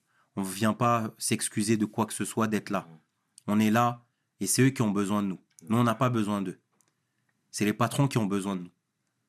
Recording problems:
none

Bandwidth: 13.5 kHz